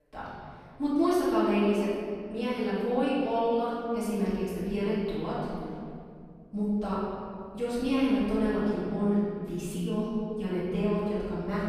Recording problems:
room echo; strong; dies away in 2.4 s
off-mic speech; far

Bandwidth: 15 kHz